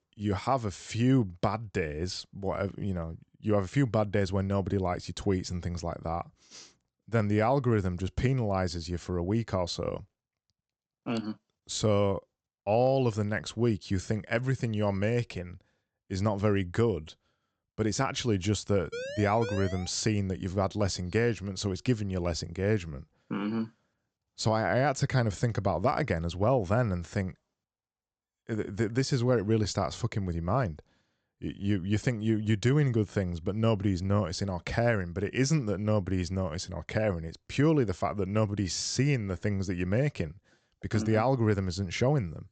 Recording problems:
high frequencies cut off; noticeable; nothing above 8 kHz
siren; noticeable; at 19 s; peak 8 dB below the speech

